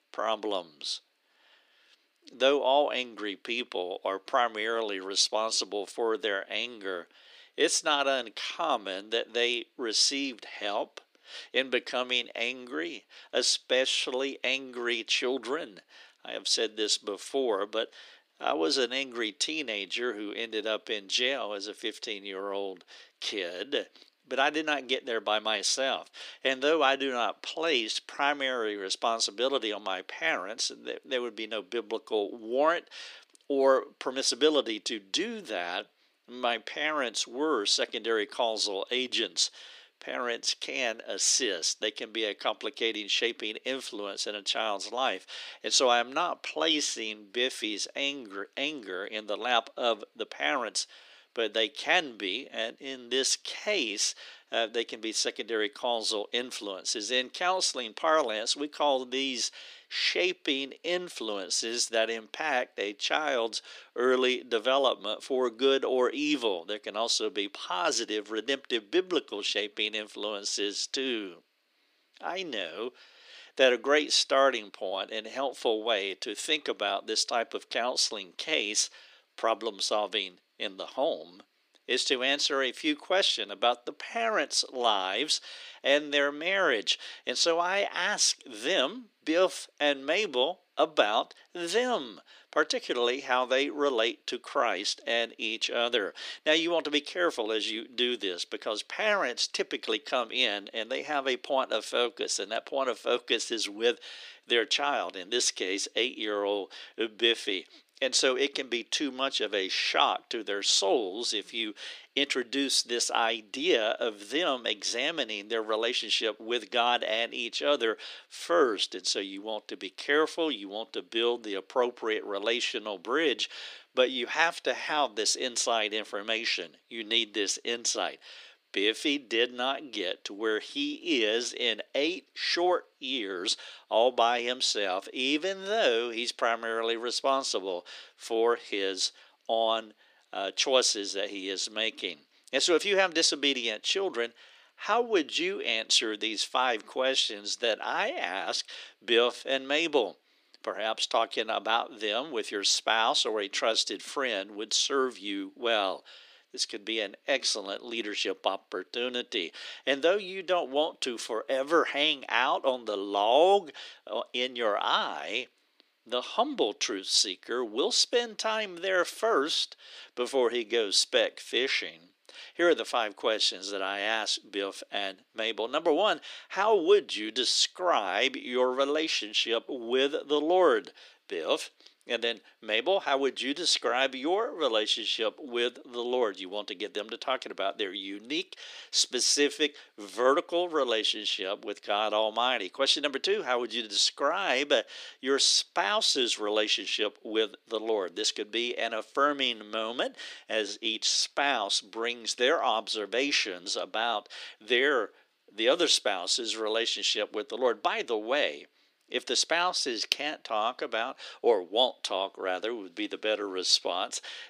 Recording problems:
thin; somewhat; fading below 300 Hz

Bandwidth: 15 kHz